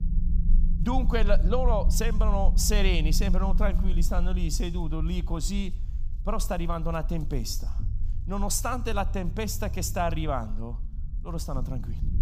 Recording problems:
low rumble; noticeable; throughout; 15 dB below the speech

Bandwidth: 15 kHz